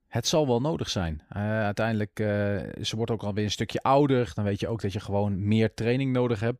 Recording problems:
none

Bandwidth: 15.5 kHz